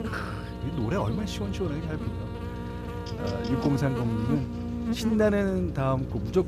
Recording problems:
electrical hum; loud; throughout; 60 Hz, 6 dB below the speech

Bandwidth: 14.5 kHz